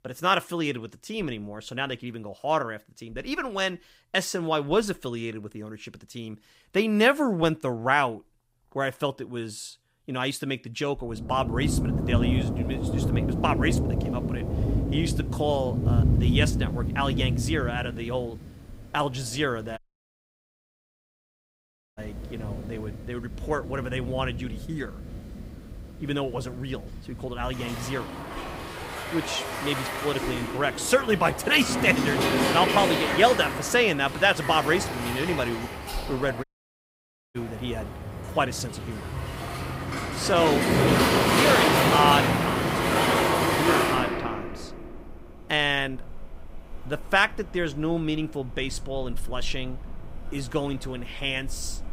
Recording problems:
rain or running water; very loud; from 12 s on; as loud as the speech
audio cutting out; at 20 s for 2 s and at 36 s for 1 s

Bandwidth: 15.5 kHz